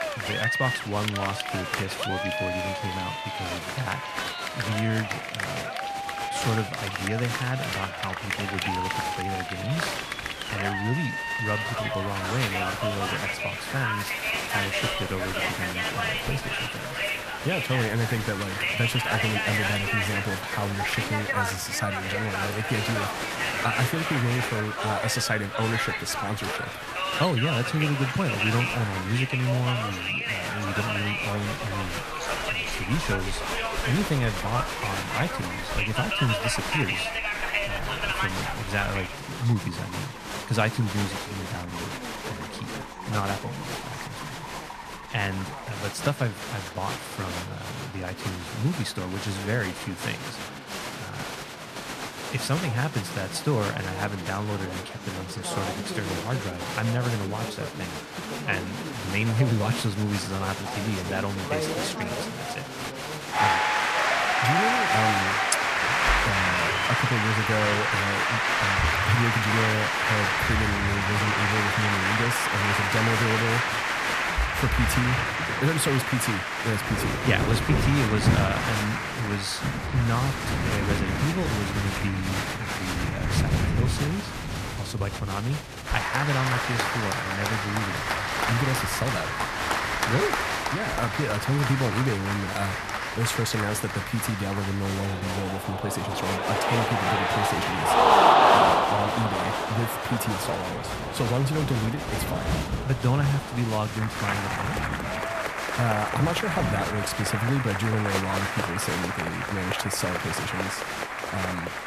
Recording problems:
crowd noise; very loud; throughout; 2 dB above the speech
rain or running water; loud; throughout; 8 dB below the speech
background music; faint; throughout; 30 dB below the speech

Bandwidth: 14.5 kHz